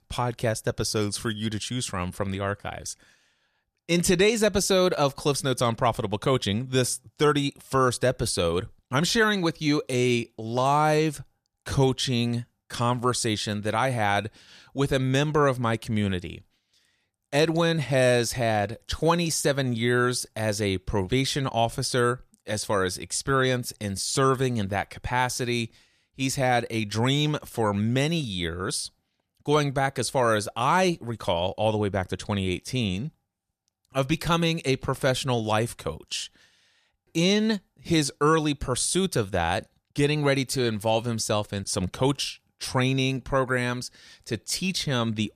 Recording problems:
none

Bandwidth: 14.5 kHz